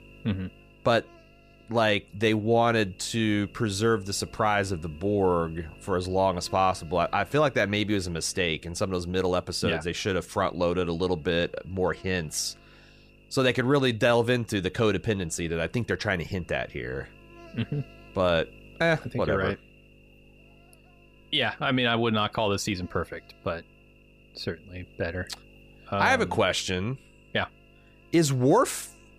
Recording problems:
electrical hum; faint; throughout; 50 Hz, 25 dB below the speech

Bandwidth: 15 kHz